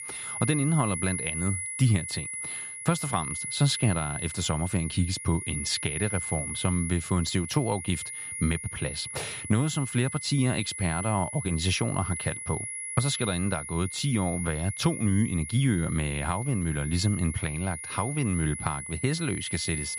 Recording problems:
high-pitched whine; loud; throughout; 10.5 kHz, 6 dB below the speech

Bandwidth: 14.5 kHz